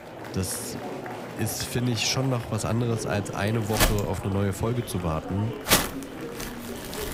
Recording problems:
household noises; very loud; throughout; 2 dB above the speech
murmuring crowd; loud; throughout; 9 dB below the speech

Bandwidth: 15.5 kHz